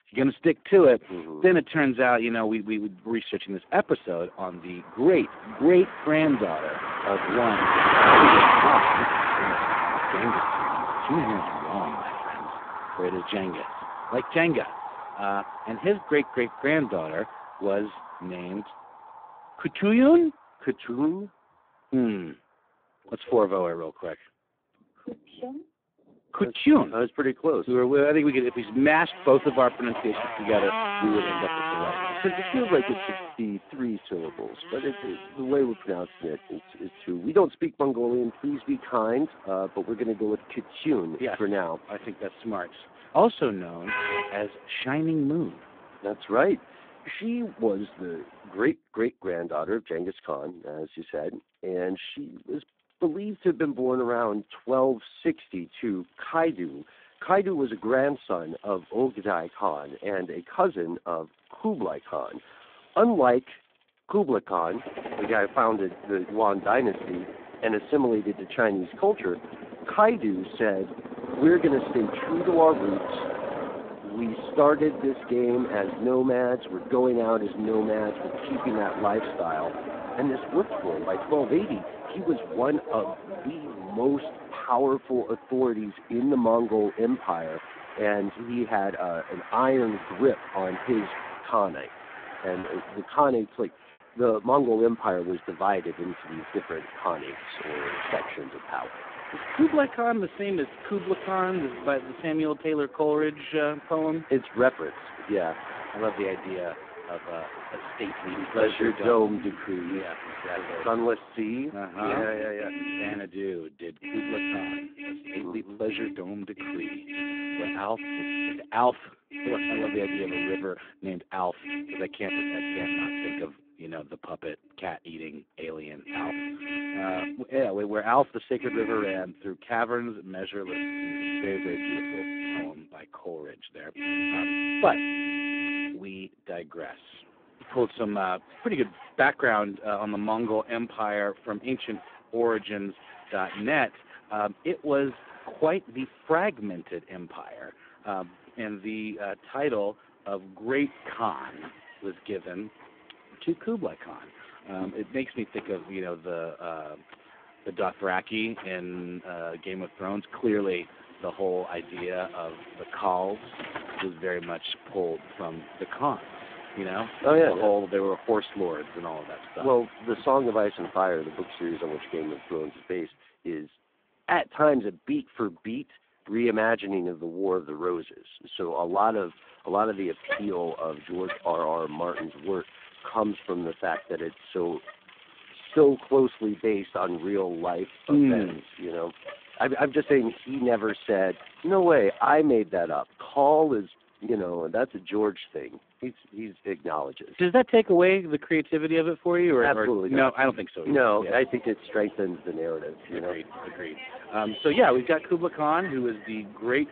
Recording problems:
phone-call audio; poor line
traffic noise; loud; throughout; 4 dB below the speech
choppy; occasionally; at 1:33; 1% of the speech affected

